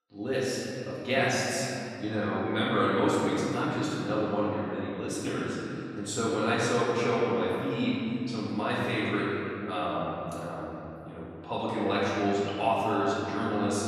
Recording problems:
room echo; strong; dies away in 2.6 s
off-mic speech; far

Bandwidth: 14 kHz